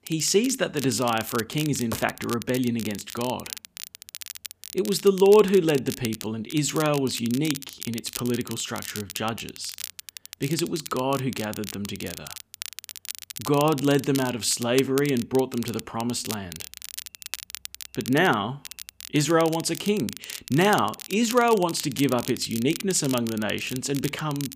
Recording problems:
crackle, like an old record; noticeable; 10 dB below the speech

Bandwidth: 15 kHz